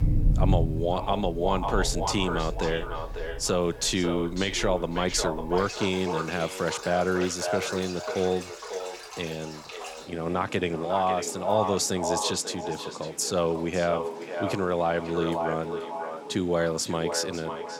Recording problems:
echo of what is said; strong; throughout; 550 ms later, 6 dB below the speech
rain or running water; loud; throughout; 9 dB below the speech

